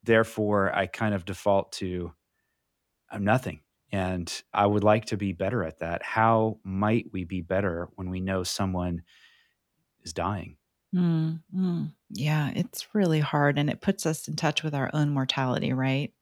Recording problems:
none

